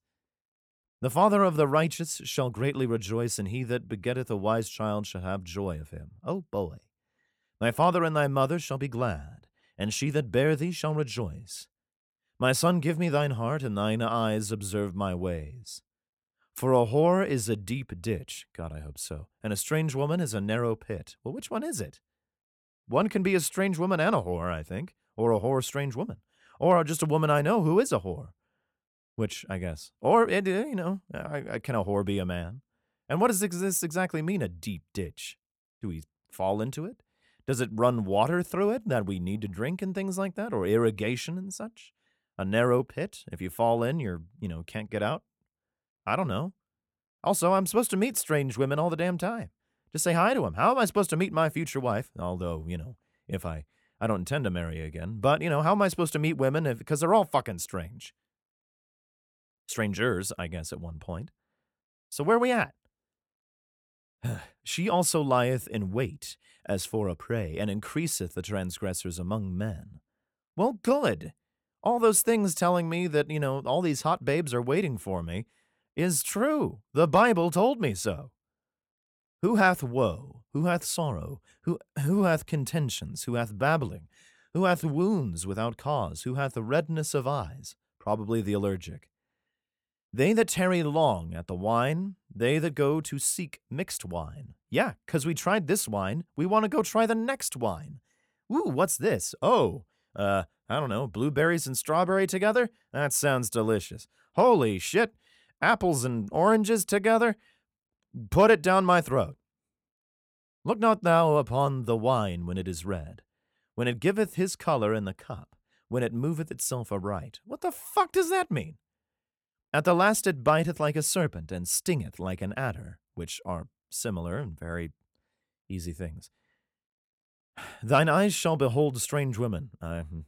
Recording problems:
none

